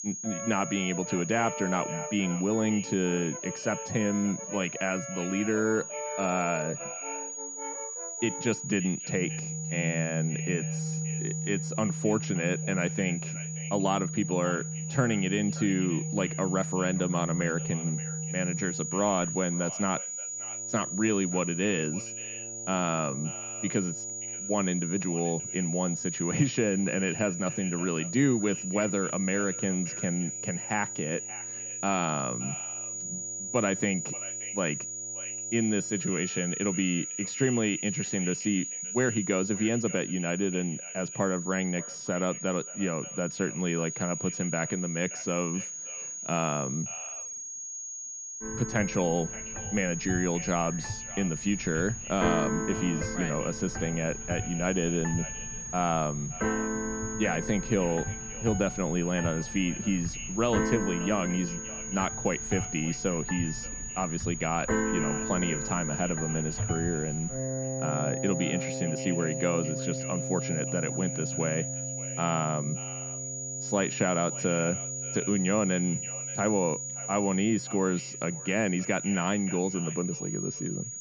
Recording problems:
muffled; slightly; fading above 2.5 kHz
echo of what is said; faint; throughout; 580 ms later, 20 dB below the speech
high-pitched whine; loud; throughout; 7 kHz, 5 dB below the speech
background music; loud; throughout; 7 dB below the speech

